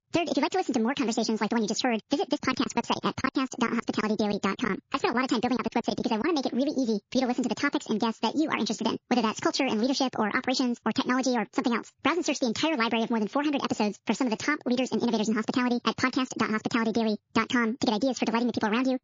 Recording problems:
wrong speed and pitch; too fast and too high; 1.7 times normal speed
garbled, watery; slightly
squashed, flat; somewhat
choppy; very; from 2.5 to 7 s; 12% of the speech affected

